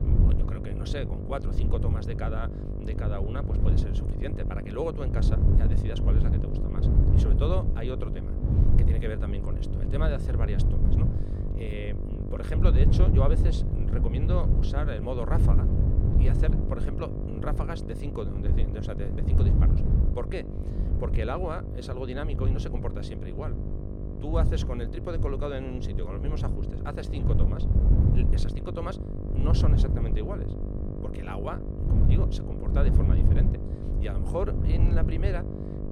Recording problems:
wind noise on the microphone; heavy; 4 dB below the speech
electrical hum; loud; throughout; 50 Hz, 6 dB below the speech

